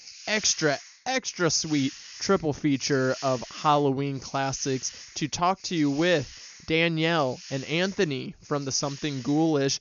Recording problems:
high frequencies cut off; noticeable; nothing above 7 kHz
hiss; noticeable; throughout; 15 dB below the speech

